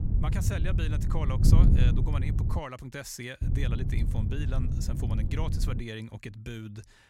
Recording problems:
wind noise on the microphone; heavy; until 2.5 s and from 3.5 to 6 s; 2 dB below the speech

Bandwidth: 16 kHz